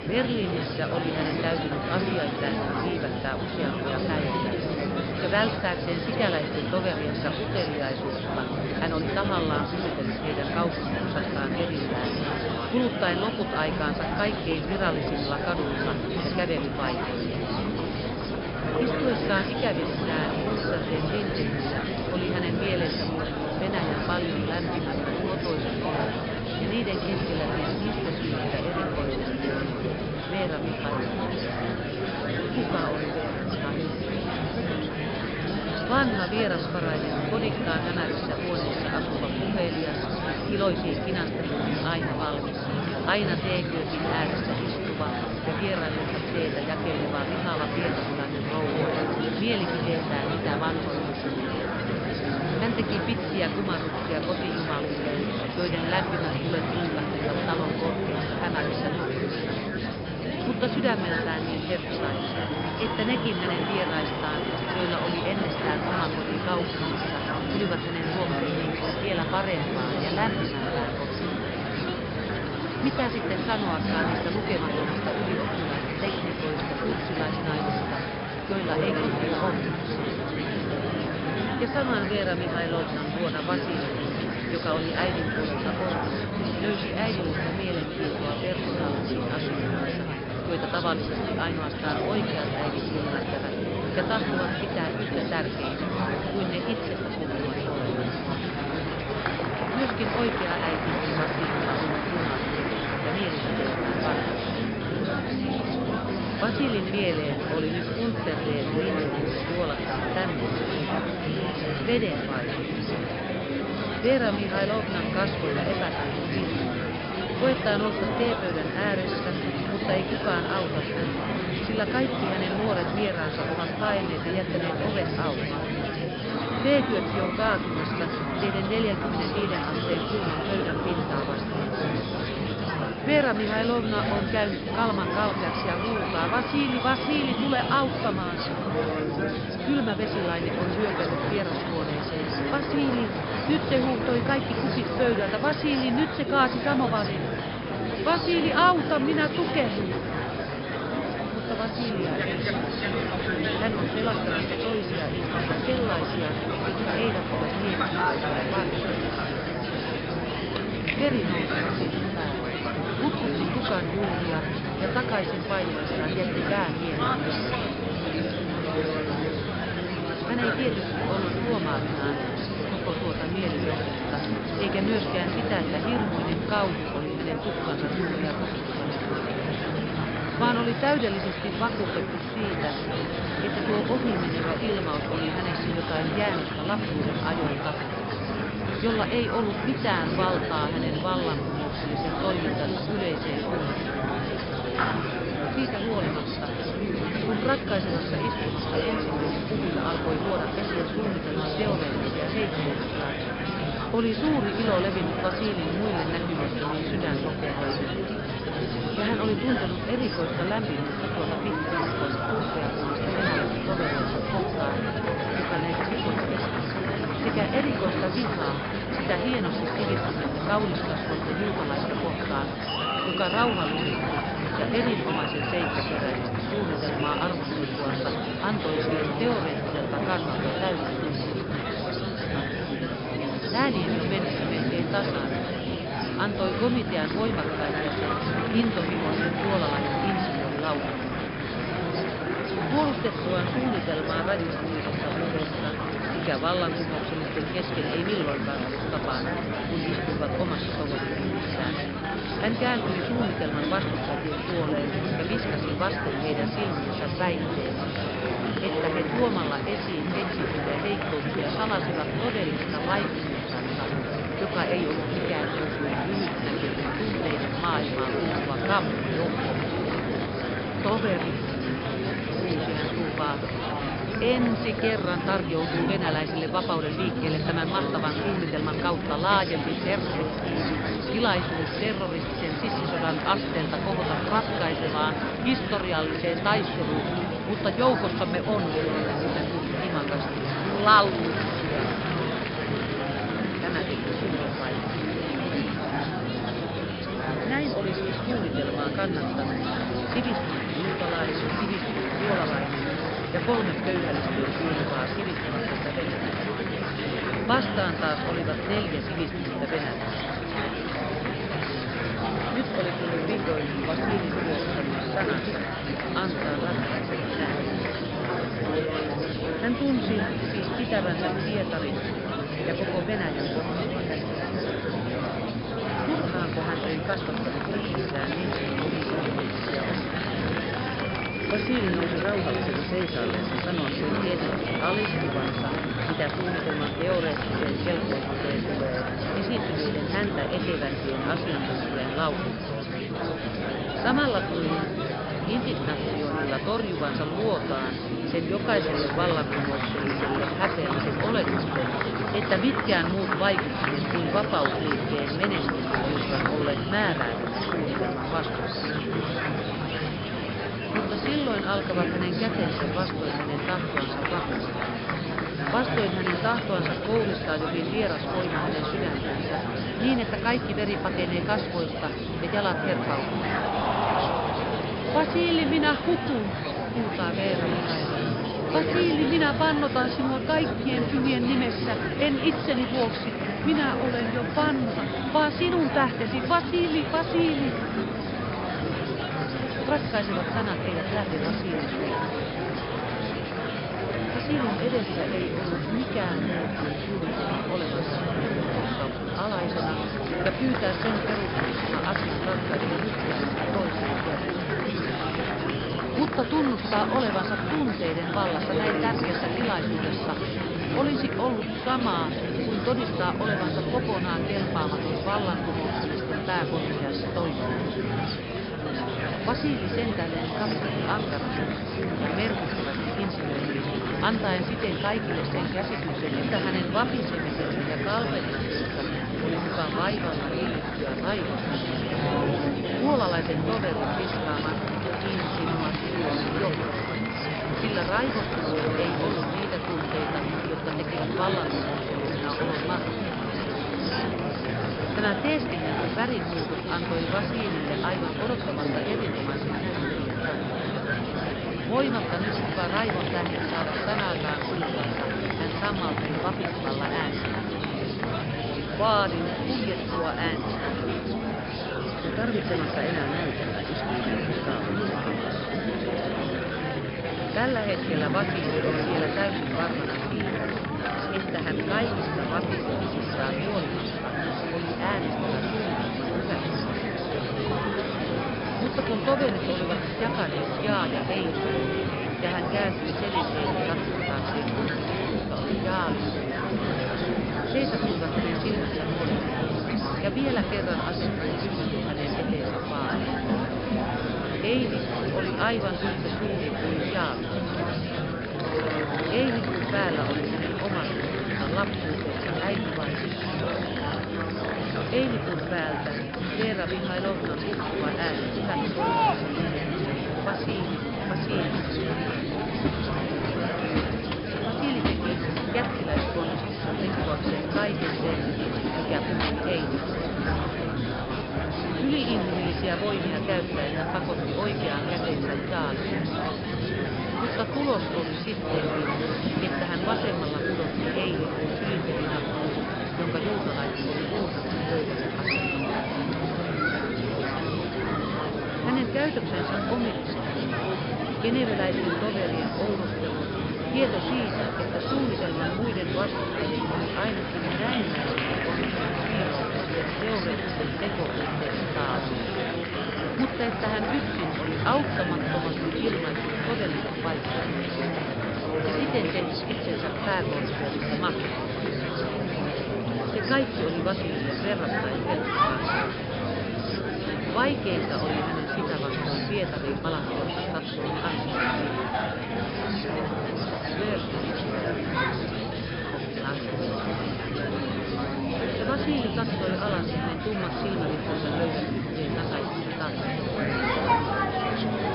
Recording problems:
high frequencies cut off; noticeable; nothing above 5.5 kHz
murmuring crowd; very loud; throughout; 2 dB above the speech

